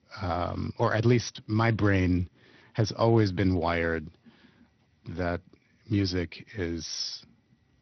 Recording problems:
garbled, watery; slightly; nothing above 6 kHz

